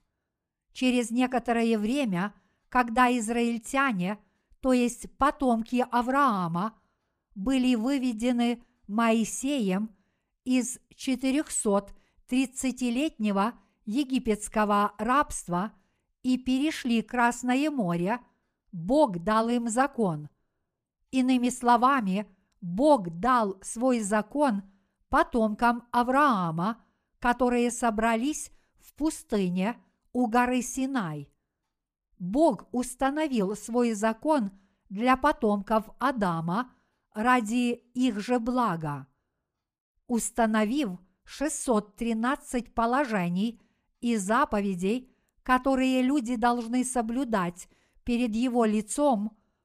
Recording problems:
none

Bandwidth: 15 kHz